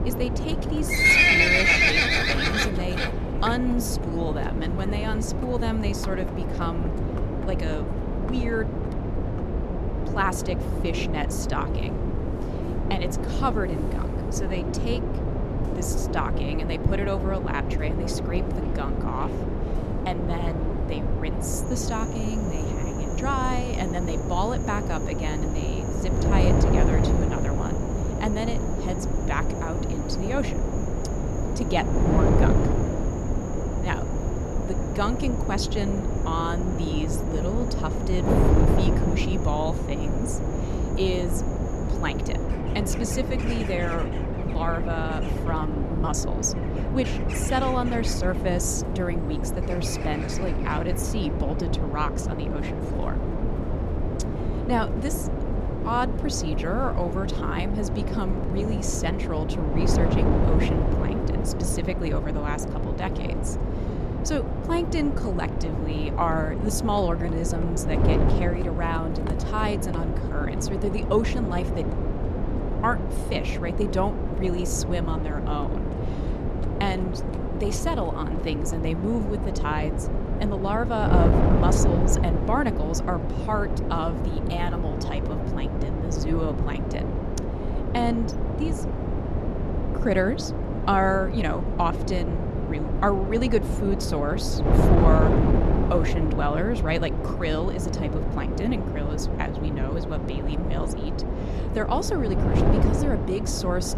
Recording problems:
animal sounds; very loud; throughout; 4 dB above the speech
wind noise on the microphone; heavy; 3 dB below the speech

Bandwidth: 13.5 kHz